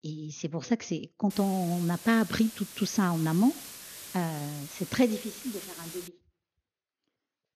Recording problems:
high frequencies cut off; noticeable; nothing above 6.5 kHz
hiss; noticeable; from 1.5 to 6 s; 15 dB below the speech

